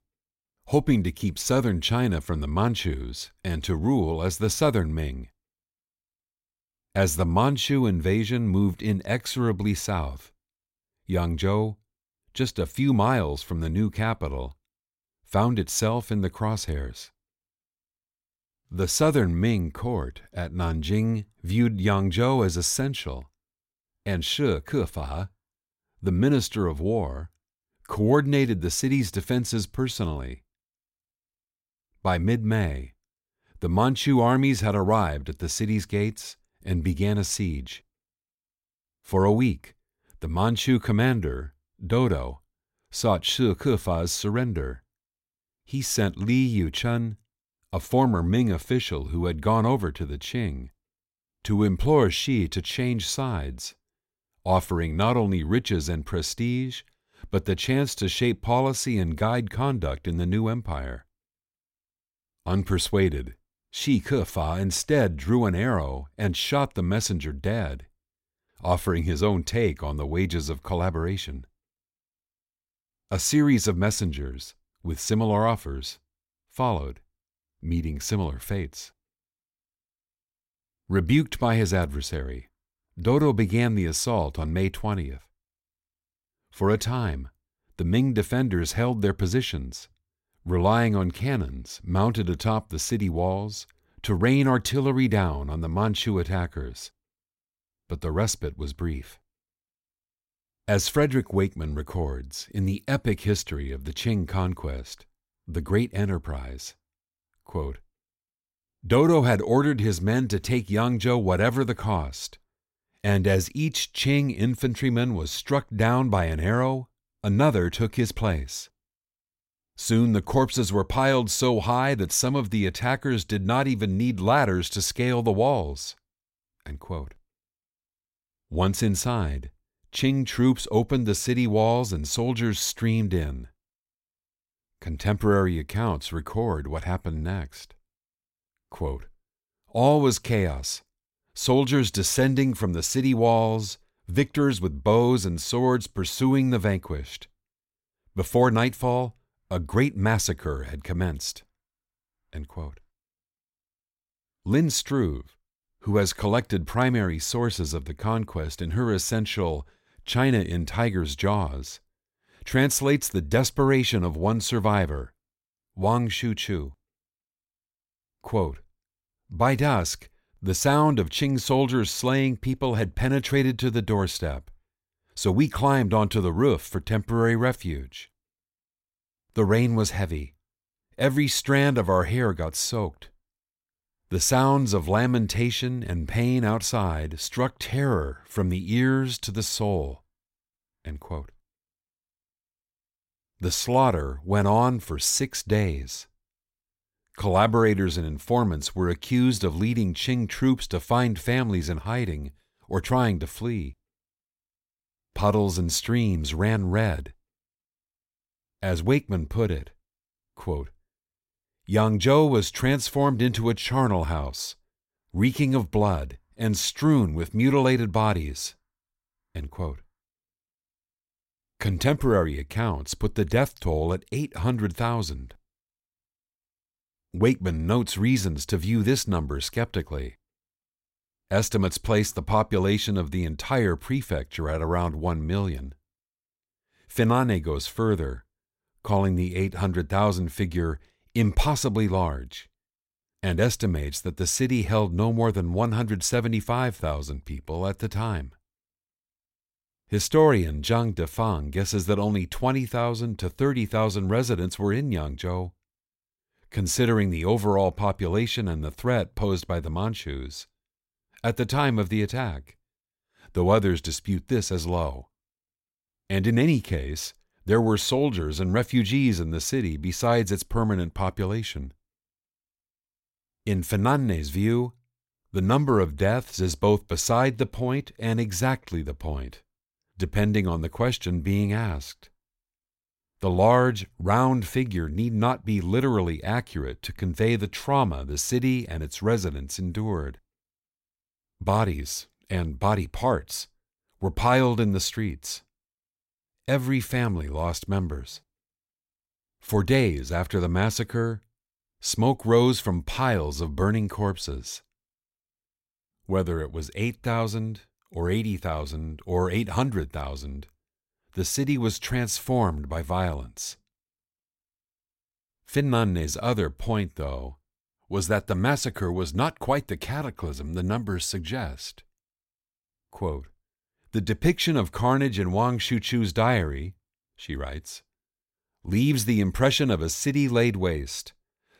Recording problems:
none

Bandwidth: 16 kHz